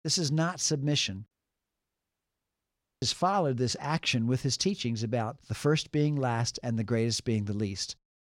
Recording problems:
audio cutting out; at 1.5 s for 1.5 s

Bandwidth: 16 kHz